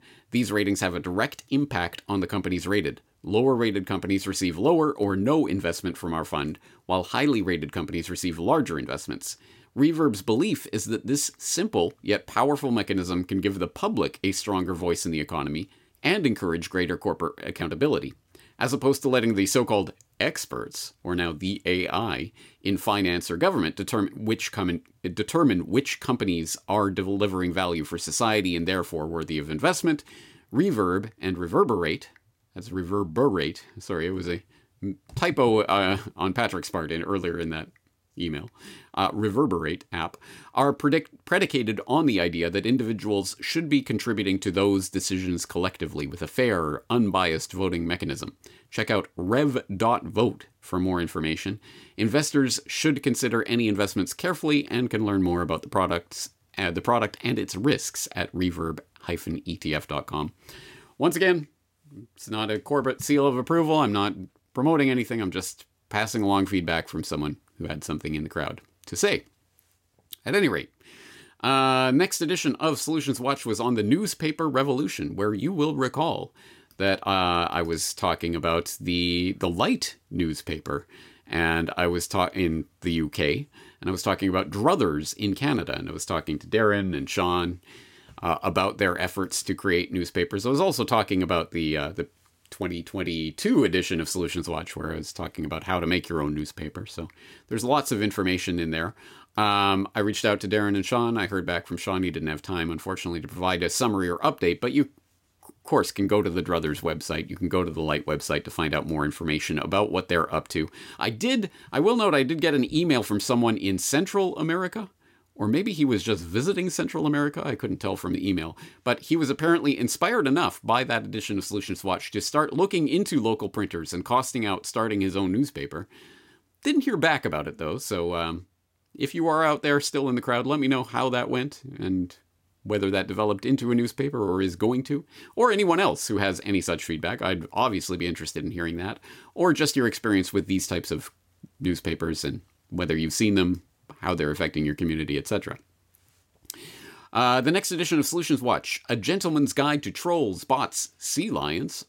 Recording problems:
none

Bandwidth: 16.5 kHz